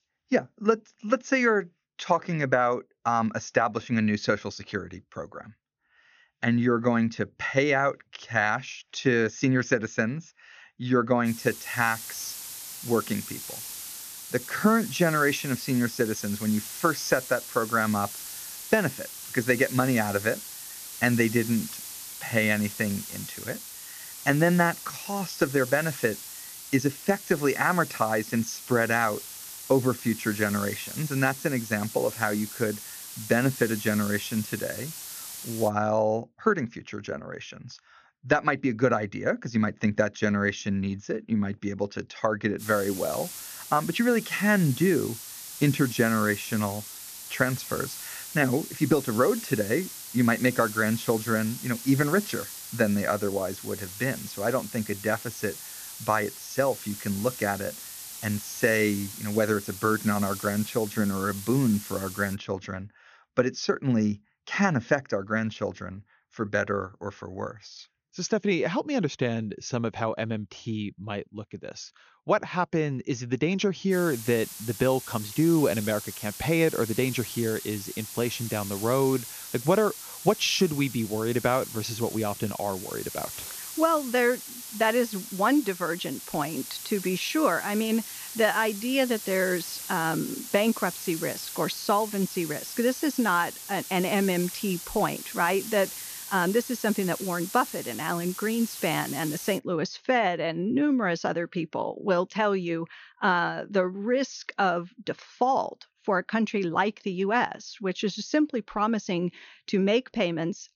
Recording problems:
high frequencies cut off; noticeable; nothing above 6.5 kHz
hiss; noticeable; from 11 to 36 s, from 43 s to 1:02 and from 1:14 to 1:40; 10 dB below the speech

